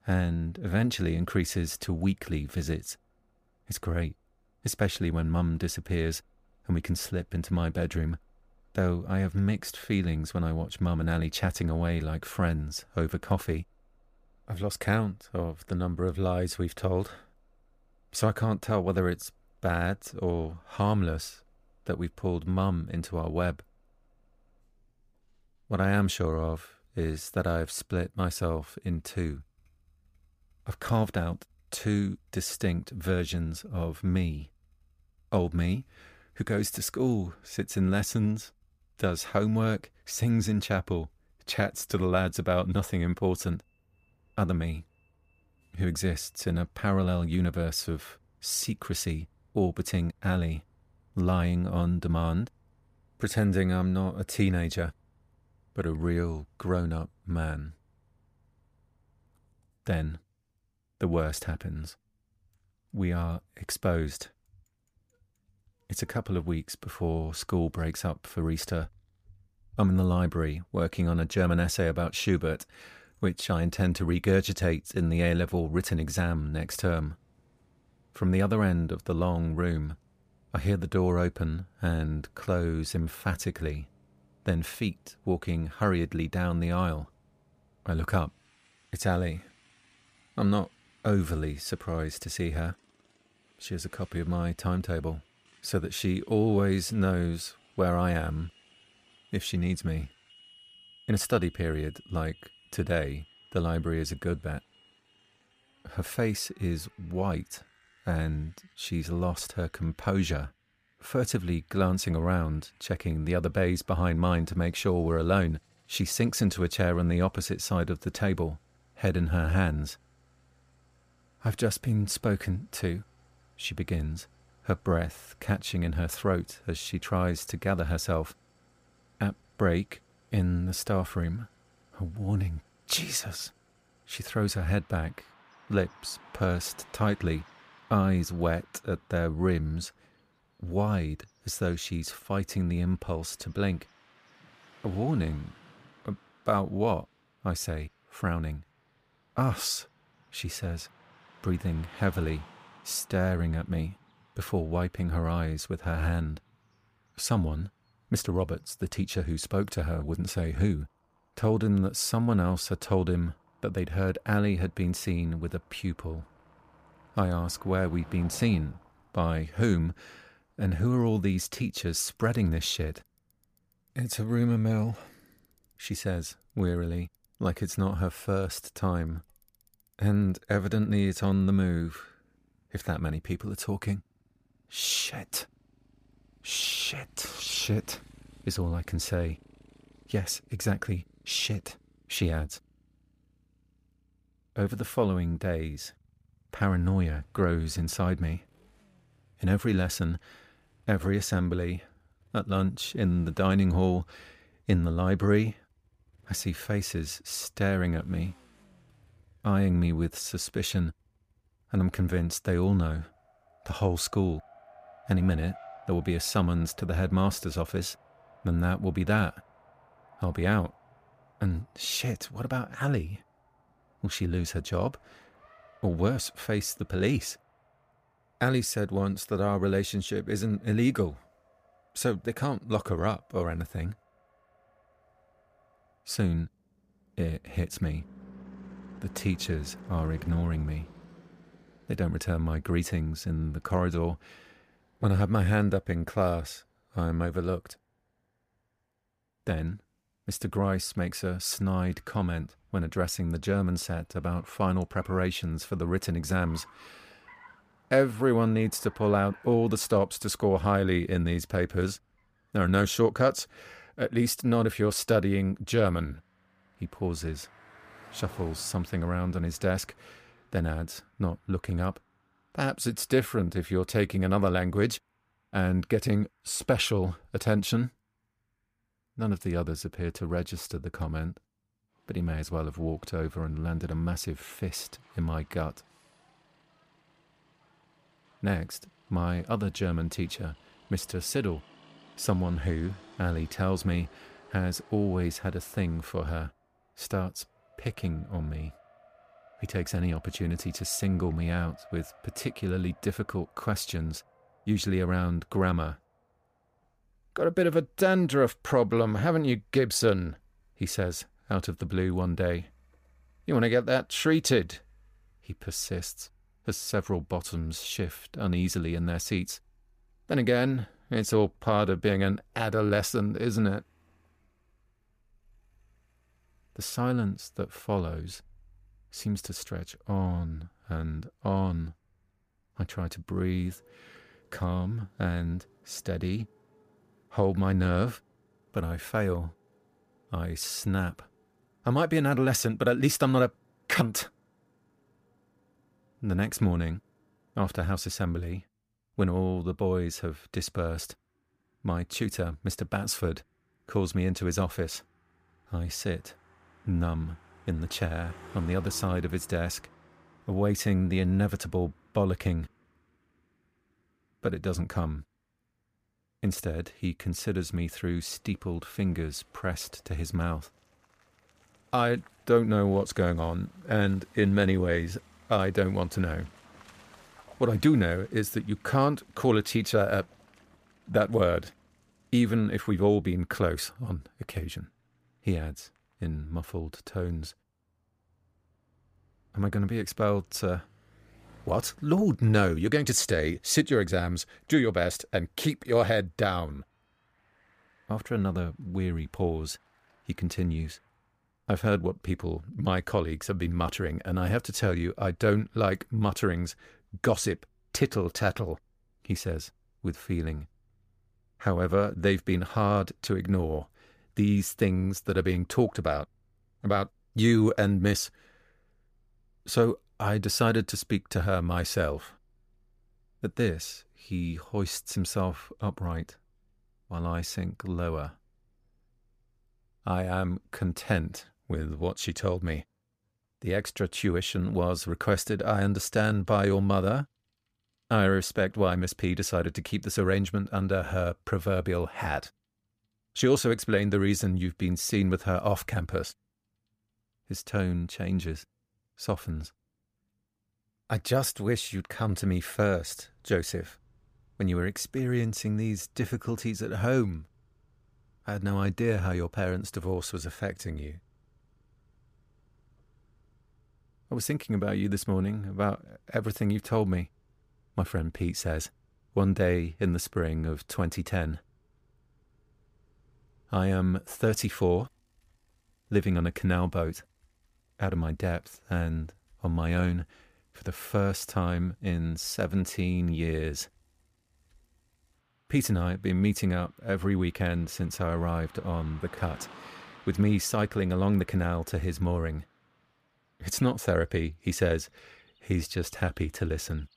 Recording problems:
traffic noise; faint; throughout; 30 dB below the speech

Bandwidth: 15 kHz